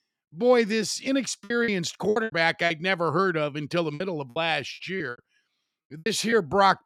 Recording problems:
choppy; very; from 1.5 to 2.5 s and from 4 to 6.5 s; 14% of the speech affected

